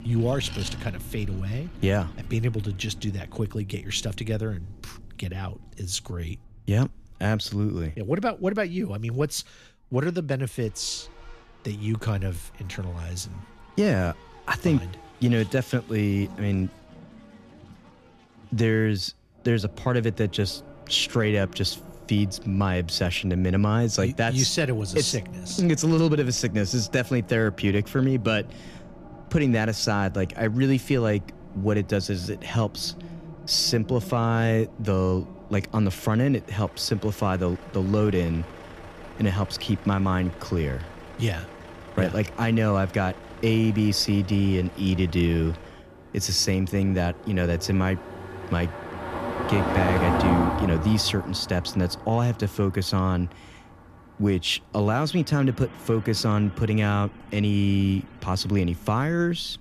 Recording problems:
traffic noise; noticeable; throughout; 15 dB below the speech

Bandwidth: 14 kHz